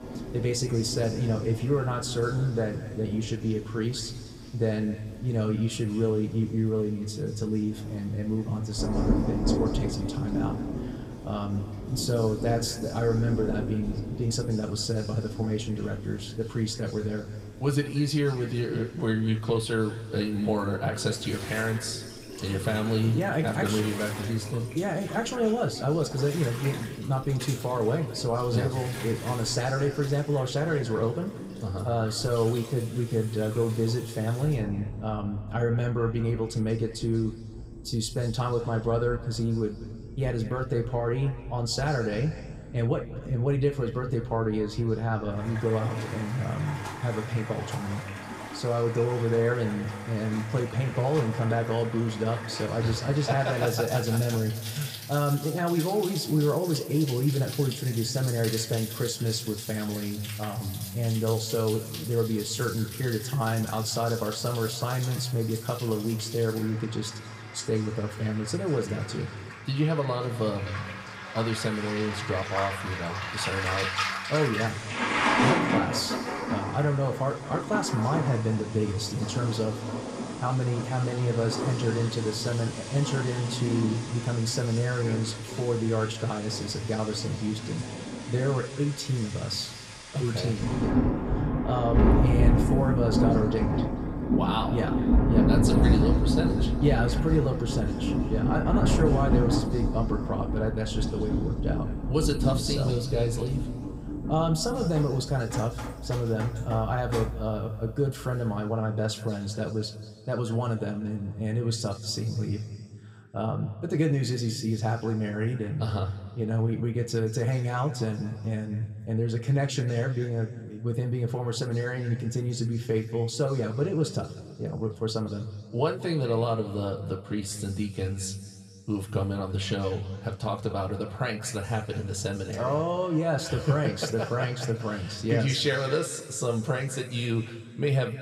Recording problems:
room echo; slight; dies away in 1.9 s
off-mic speech; somewhat distant
rain or running water; loud; until 1:48; 3 dB below the speech

